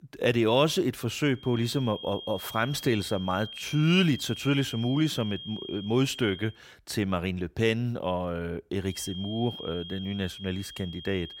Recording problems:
high-pitched whine; noticeable; from 1.5 to 6.5 s and from 9 s on; 3 kHz, 10 dB below the speech

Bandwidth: 16 kHz